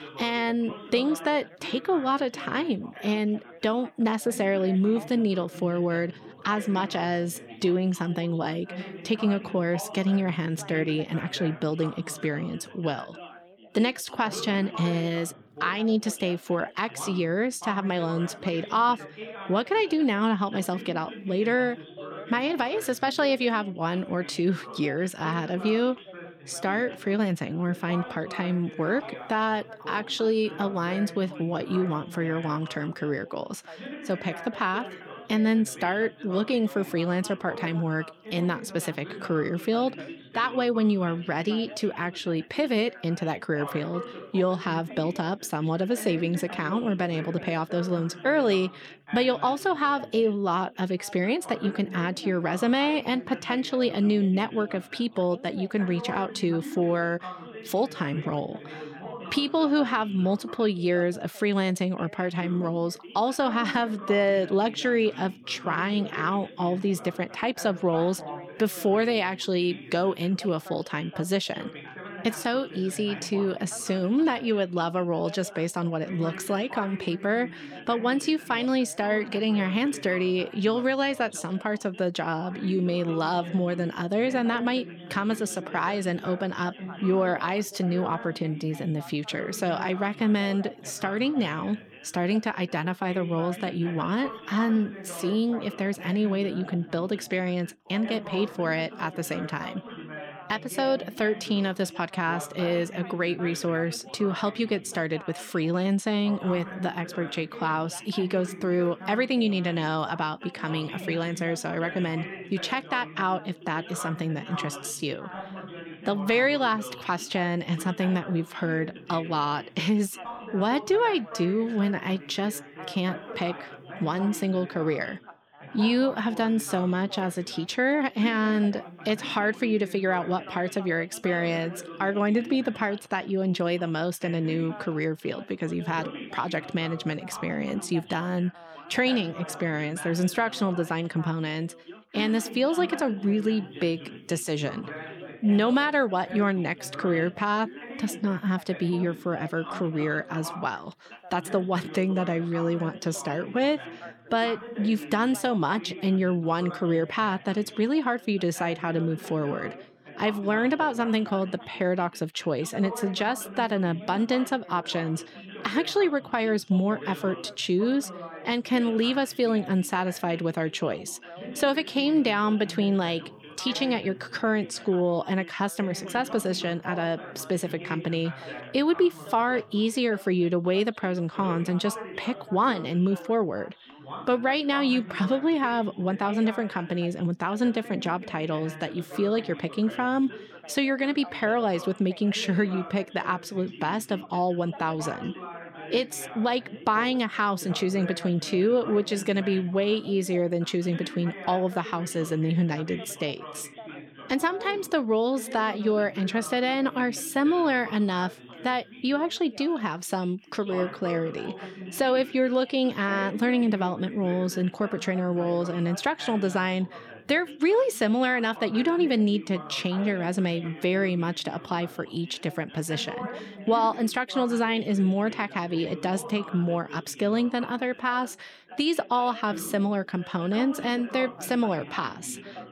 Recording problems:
background chatter; noticeable; throughout; 3 voices, 15 dB below the speech

